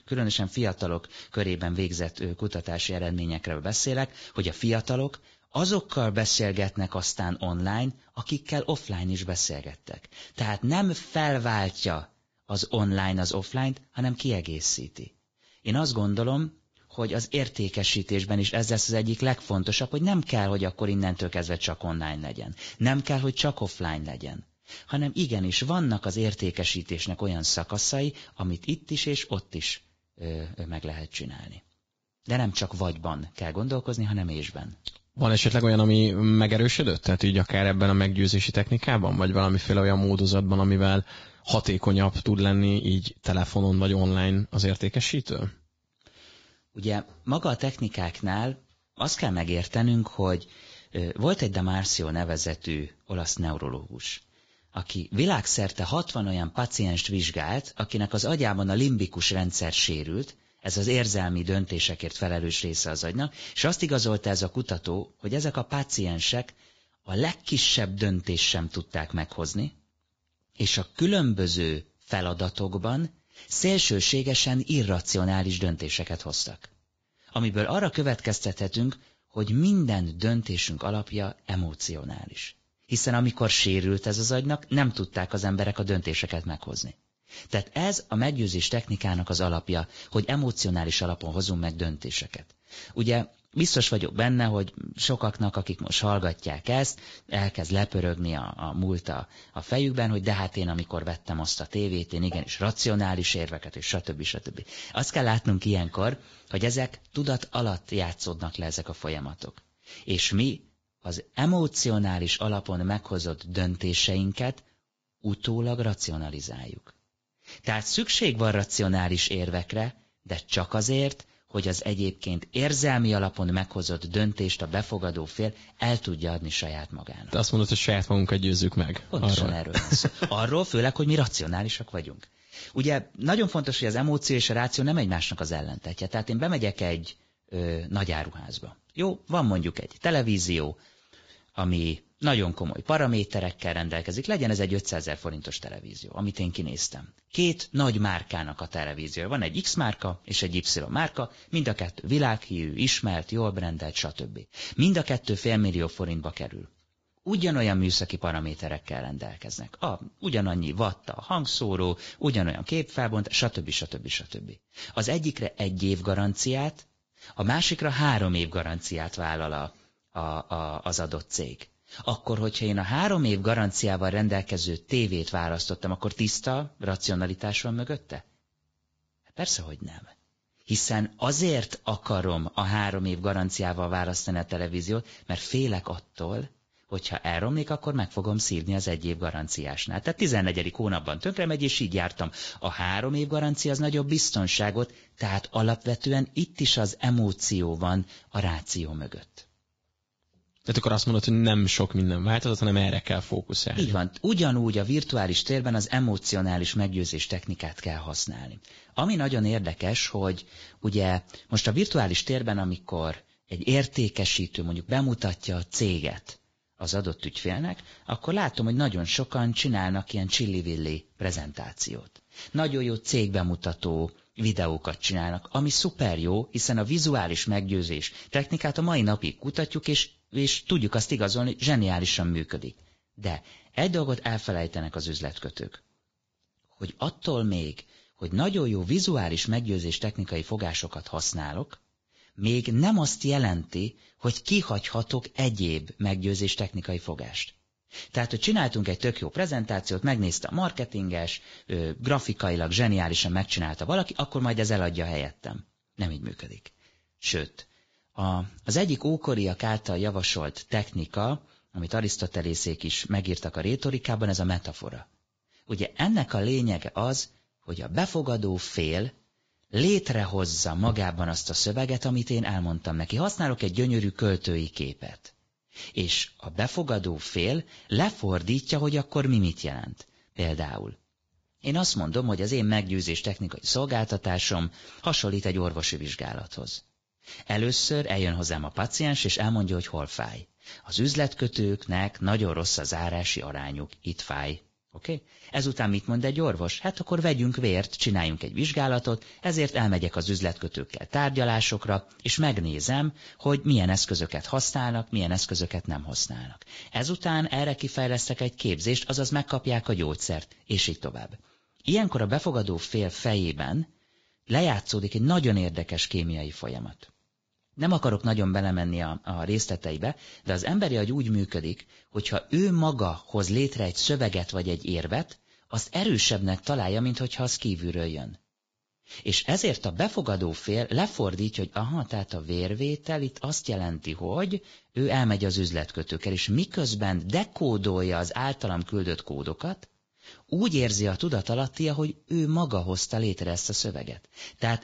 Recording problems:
garbled, watery; badly; nothing above 7.5 kHz

